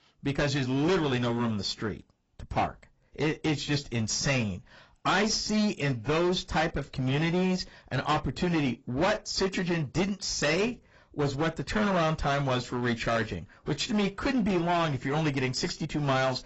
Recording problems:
distortion; heavy; 13% of the sound clipped
garbled, watery; badly; nothing above 7.5 kHz

